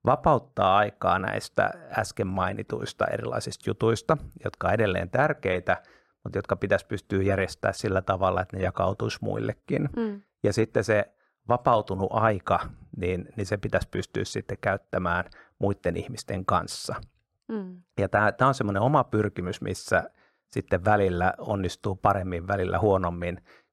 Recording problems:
muffled; slightly; fading above 1.5 kHz

